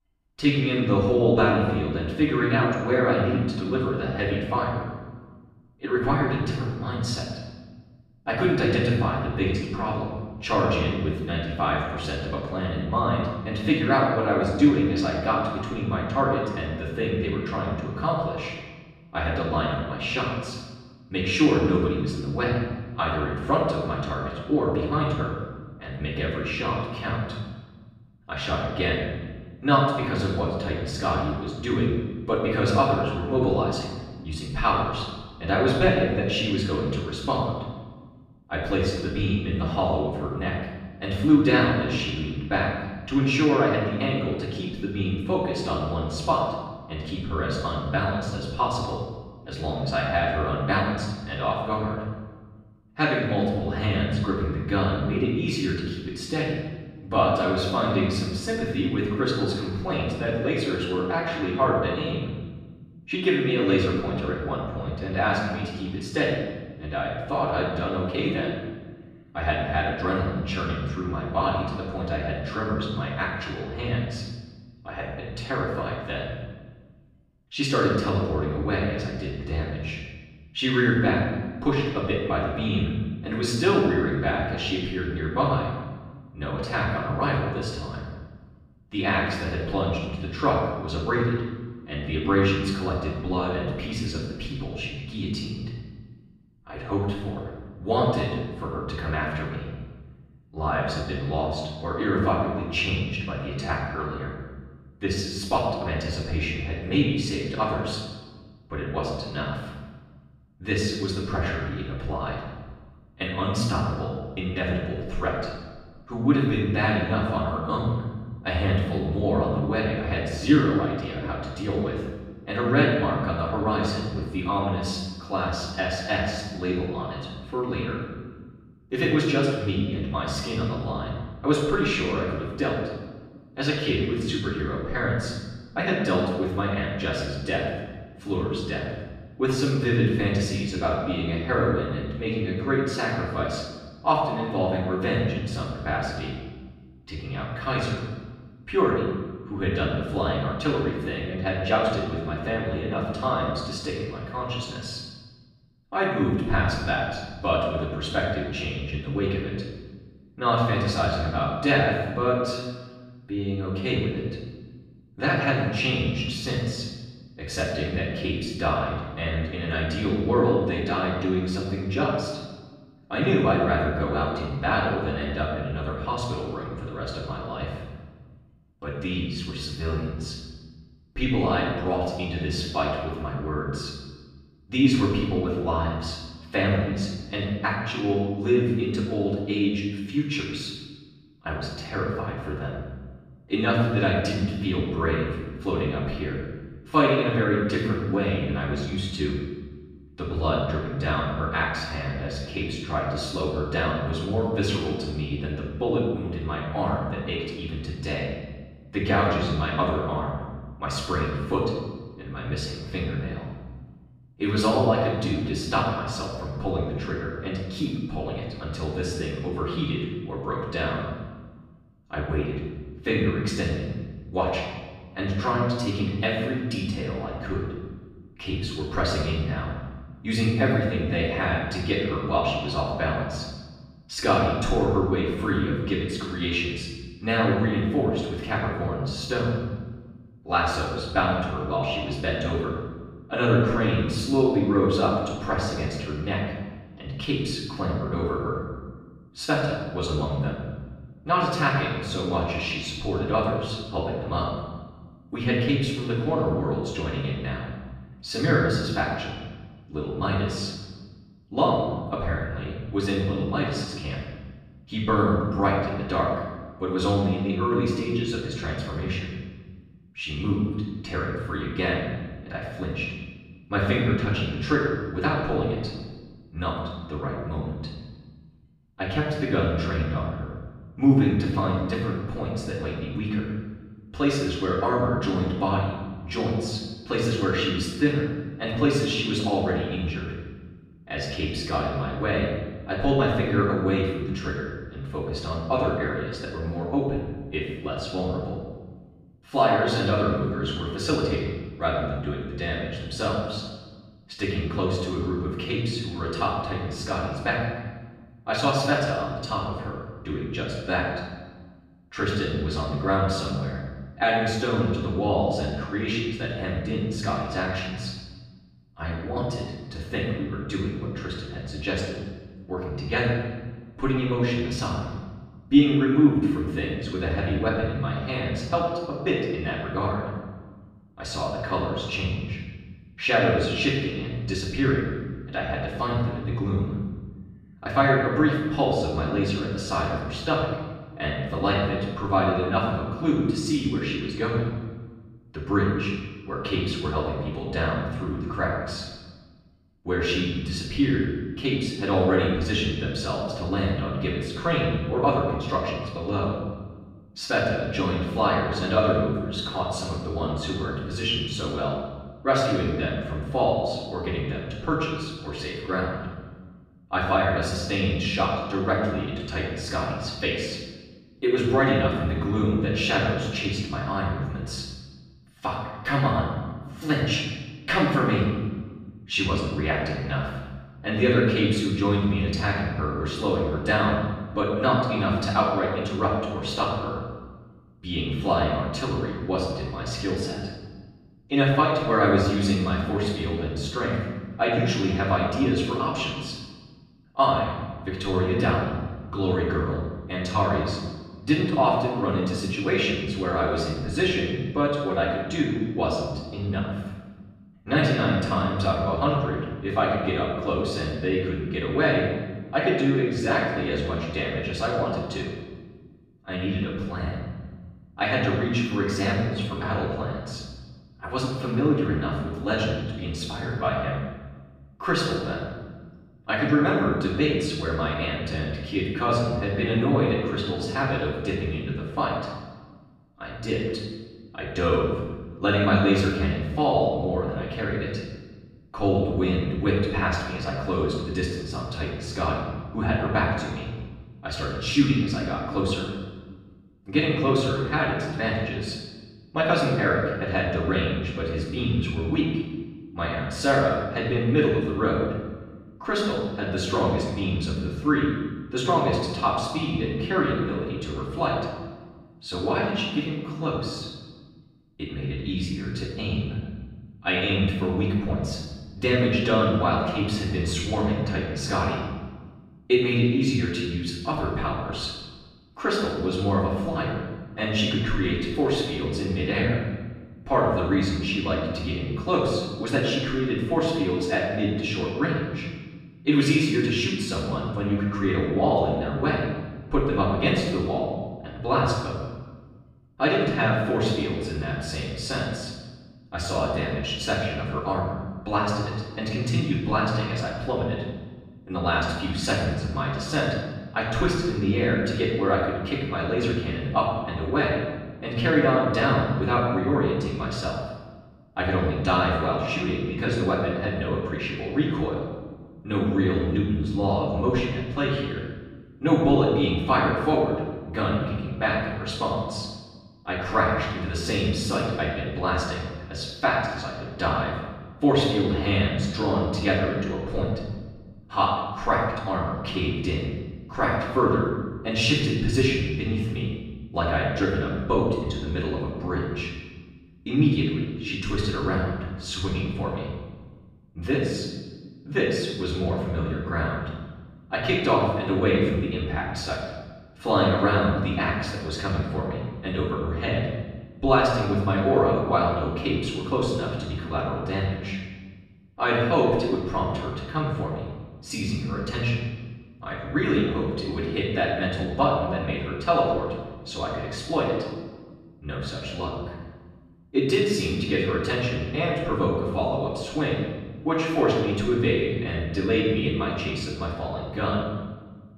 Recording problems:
off-mic speech; far
room echo; noticeable; dies away in 1.2 s

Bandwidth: 14.5 kHz